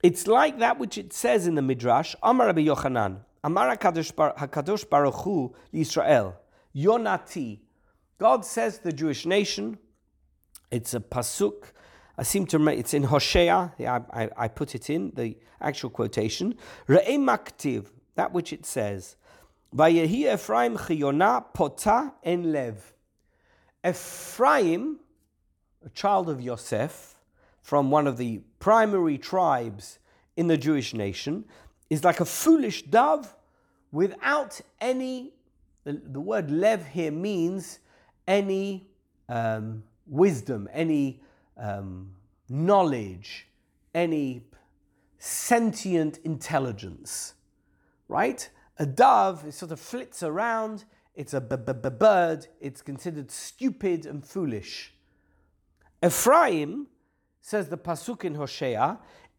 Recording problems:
audio stuttering; at 24 s and at 51 s

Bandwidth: 18.5 kHz